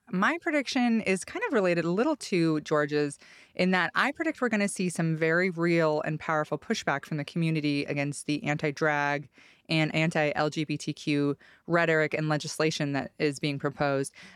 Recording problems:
none

